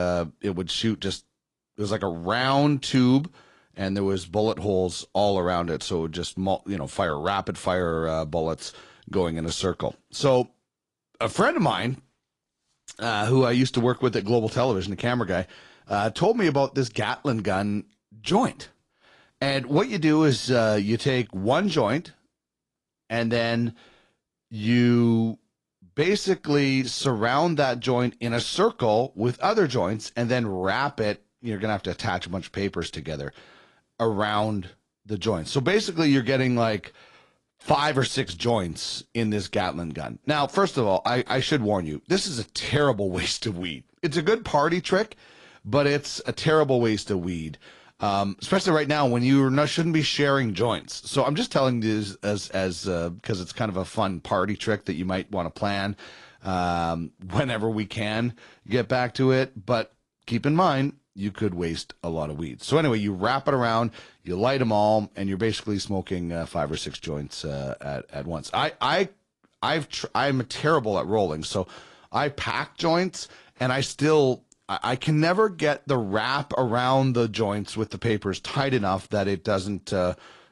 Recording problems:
garbled, watery; slightly
abrupt cut into speech; at the start

